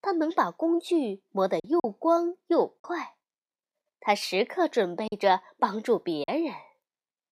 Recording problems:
choppy; very; at 1.5 s and from 5 to 6.5 s; 6% of the speech affected

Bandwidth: 15.5 kHz